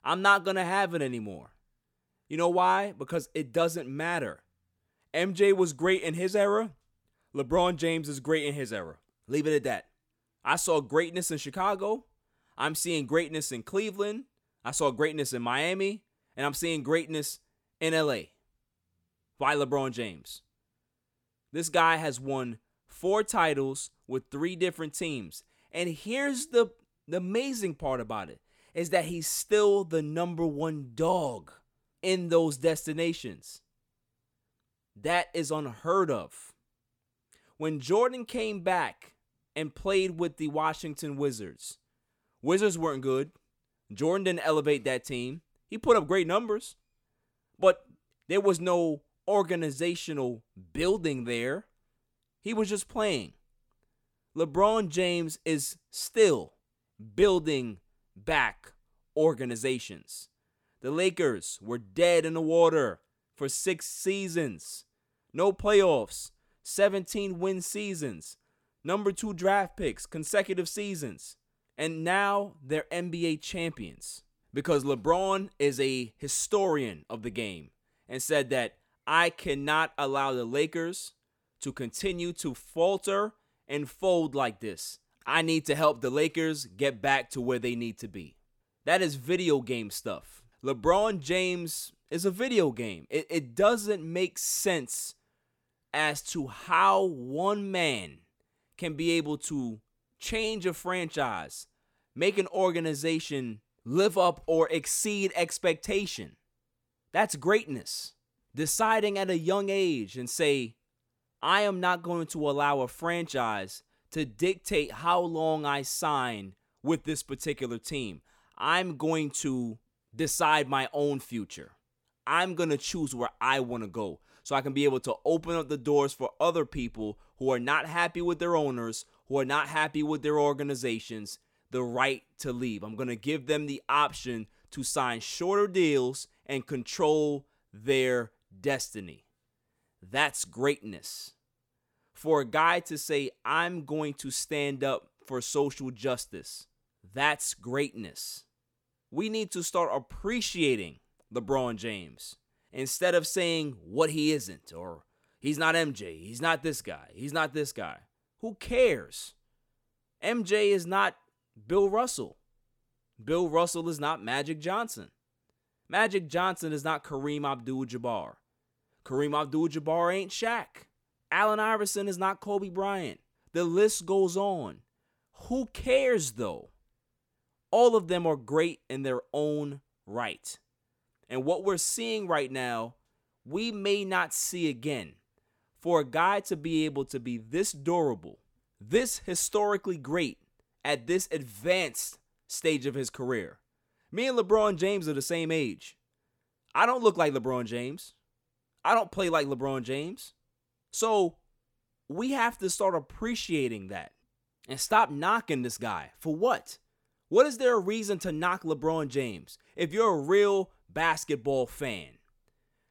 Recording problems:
none

